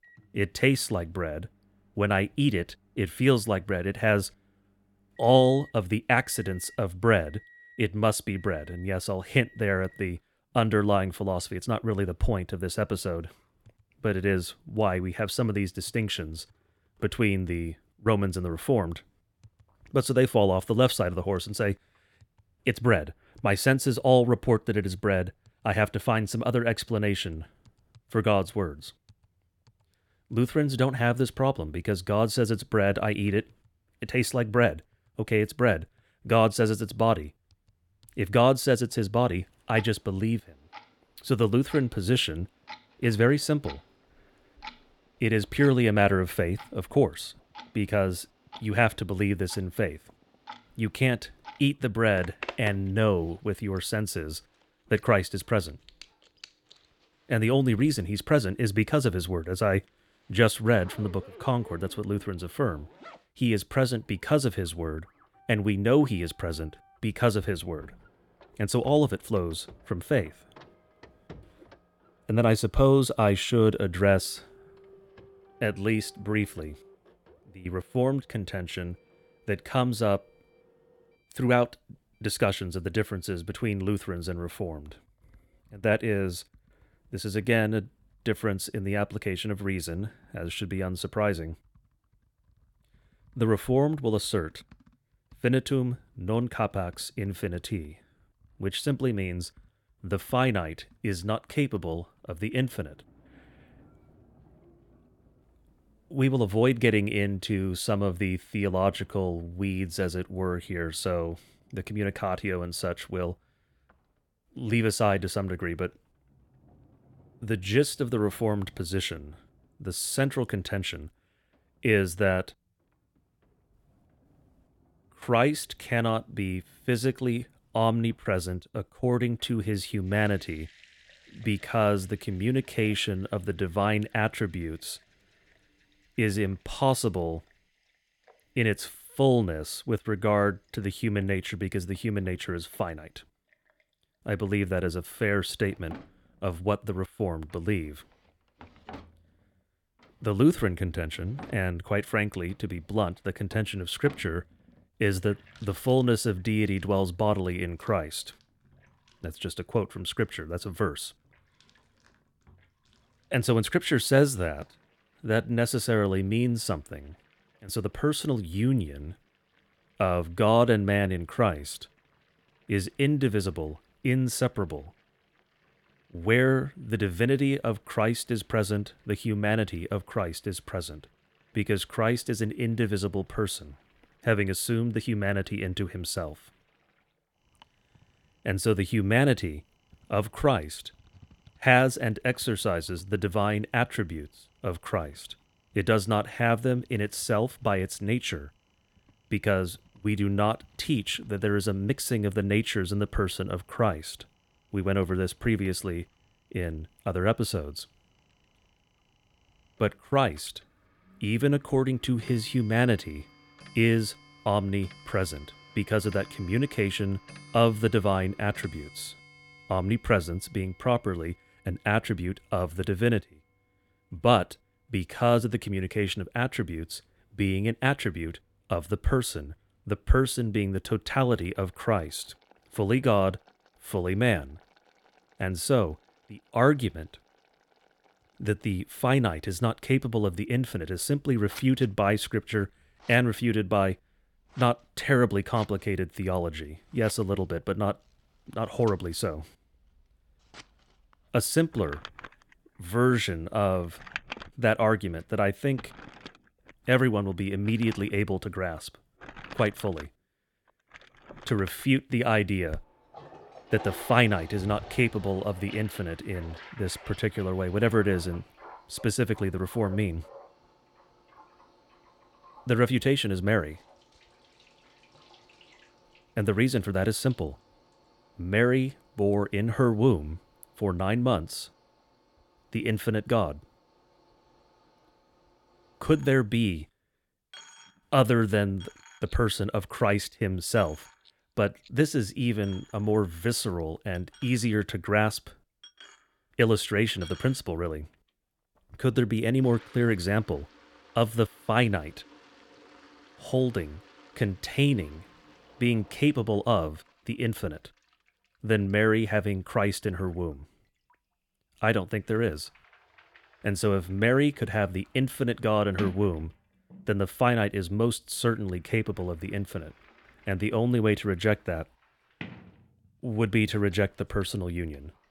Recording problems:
household noises; faint; throughout; 25 dB below the speech

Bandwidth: 17.5 kHz